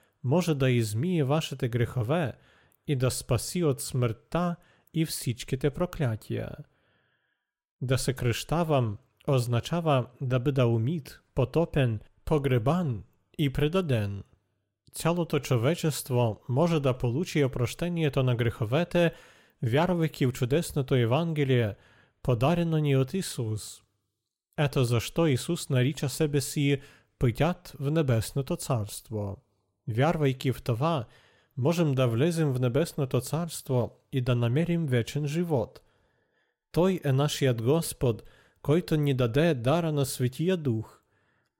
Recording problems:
none

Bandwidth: 16.5 kHz